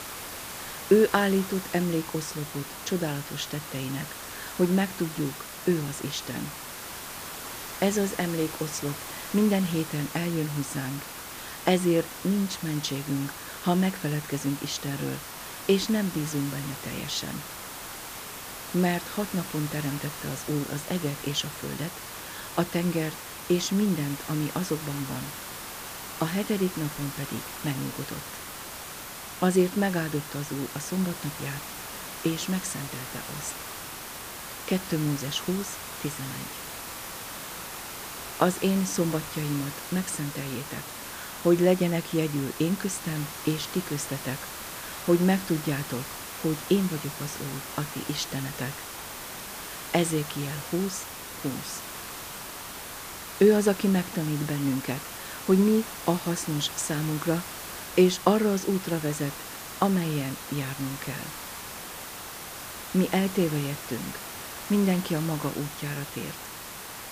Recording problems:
hiss; loud; throughout; 8 dB below the speech

